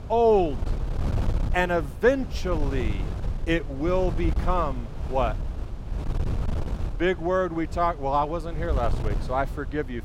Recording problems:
wind noise on the microphone; occasional gusts; 15 dB below the speech

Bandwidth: 16 kHz